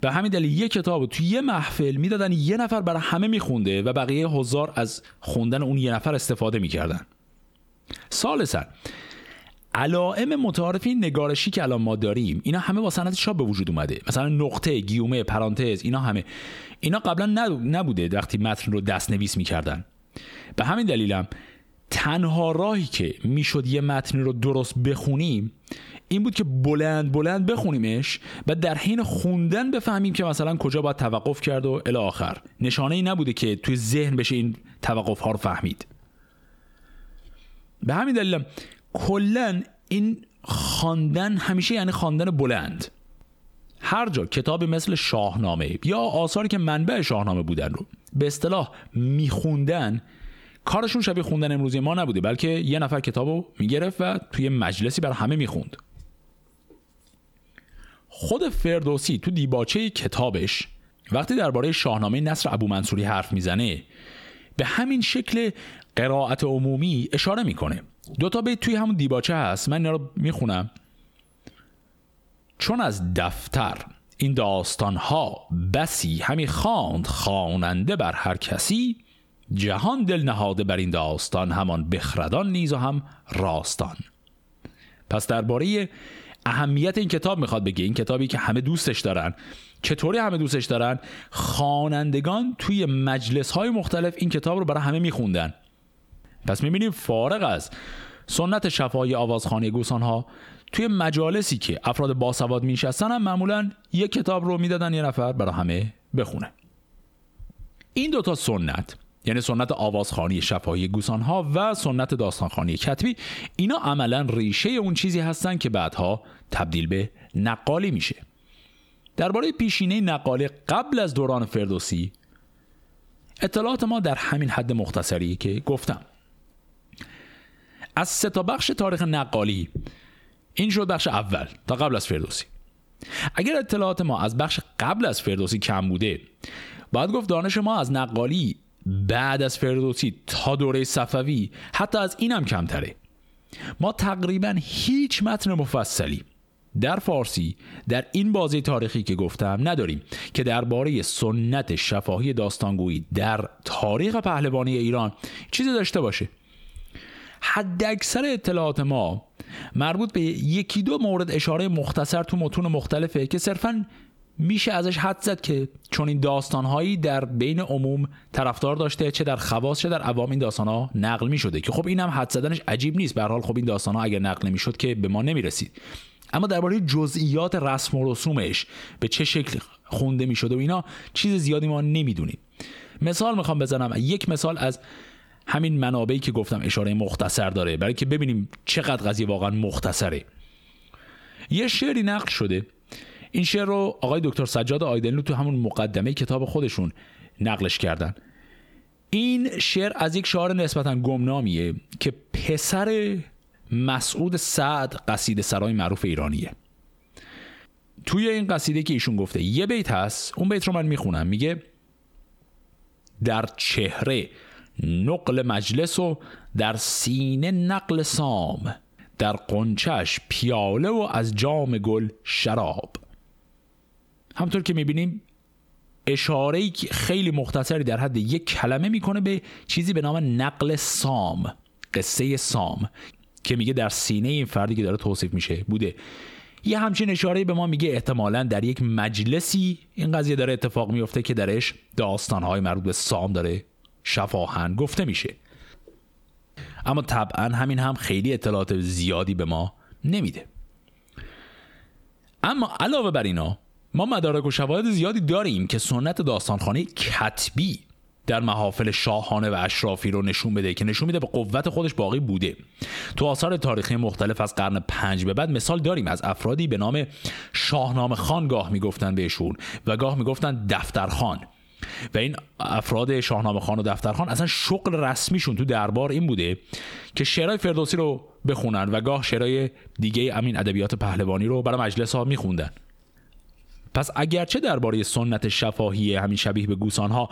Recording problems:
squashed, flat; heavily

